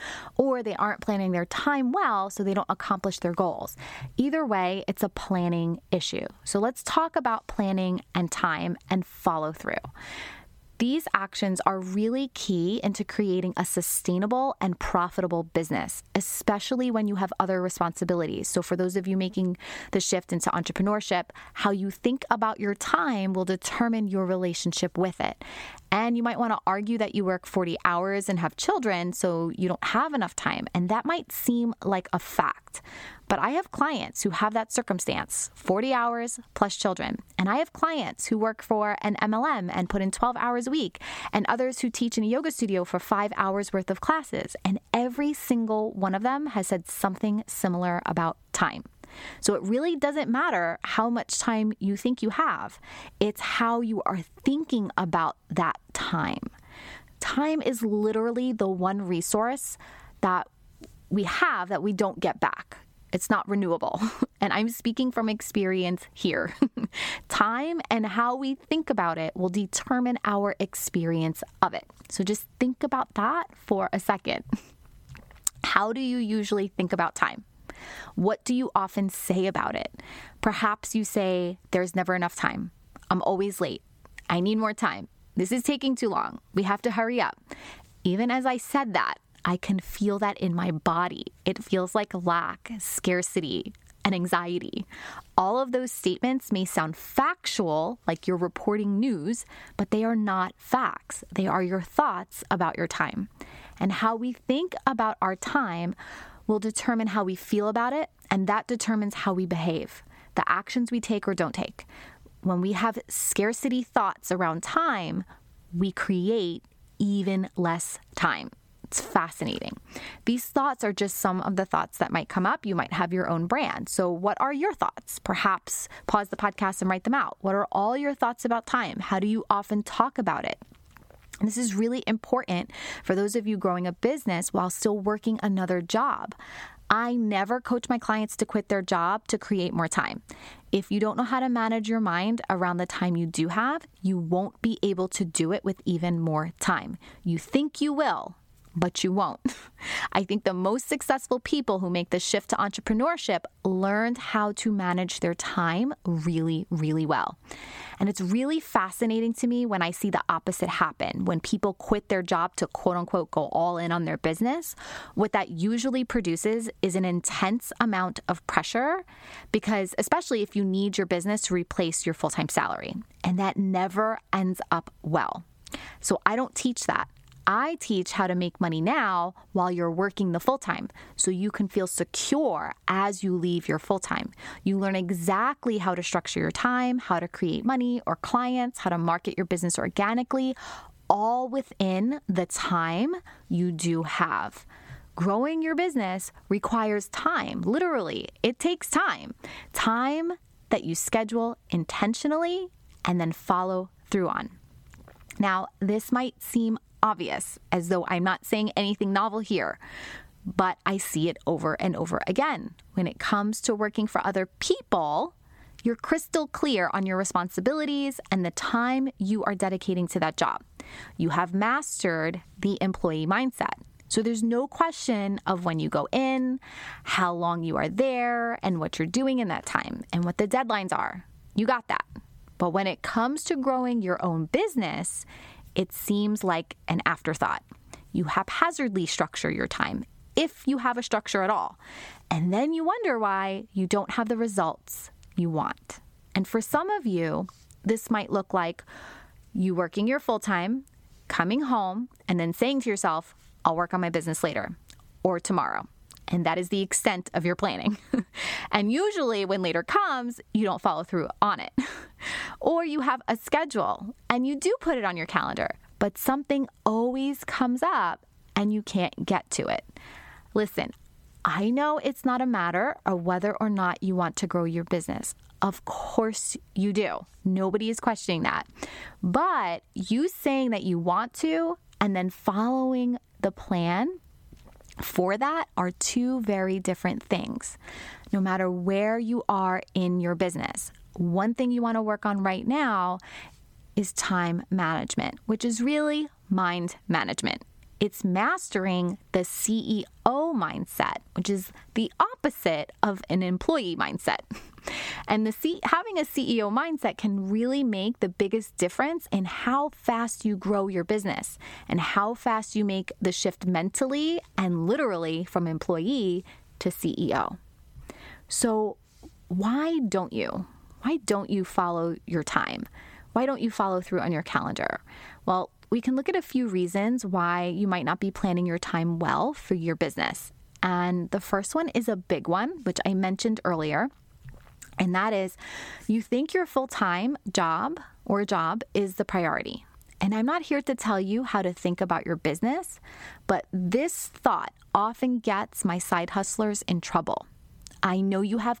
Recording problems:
squashed, flat; somewhat

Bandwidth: 17 kHz